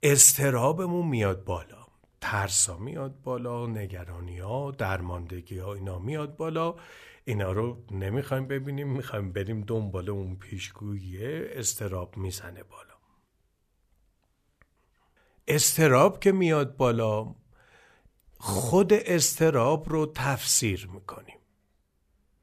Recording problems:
none

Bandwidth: 14.5 kHz